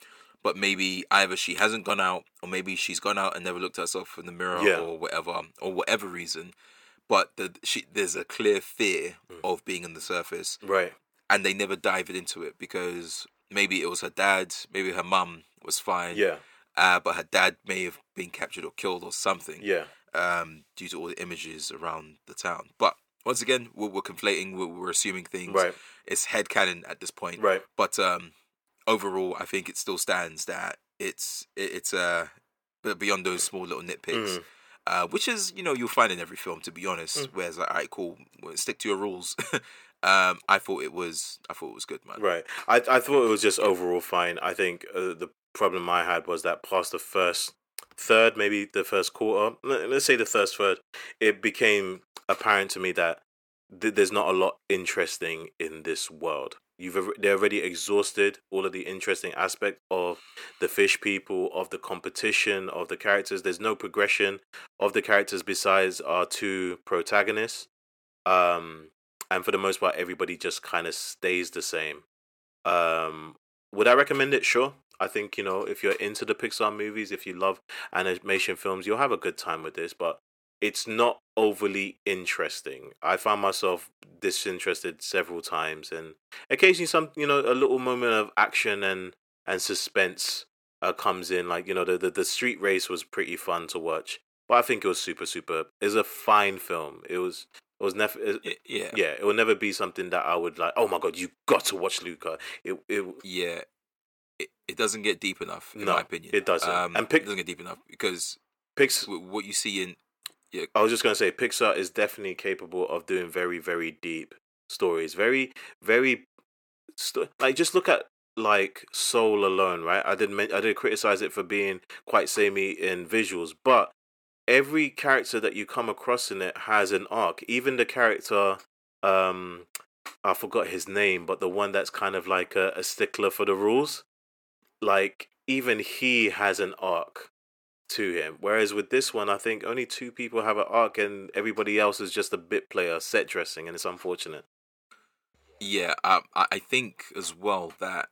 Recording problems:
thin; somewhat; fading below 400 Hz

